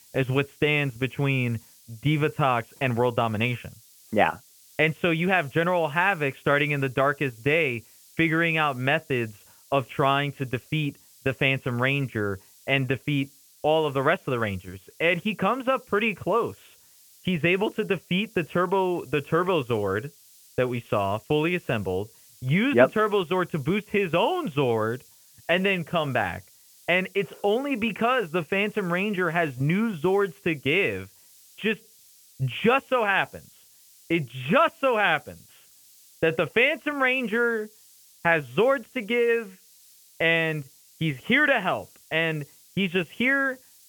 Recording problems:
high frequencies cut off; severe; nothing above 3.5 kHz
hiss; faint; throughout; 25 dB below the speech

